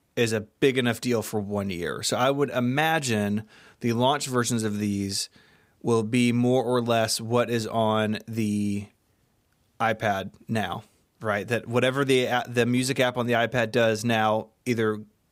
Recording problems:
none

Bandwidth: 15.5 kHz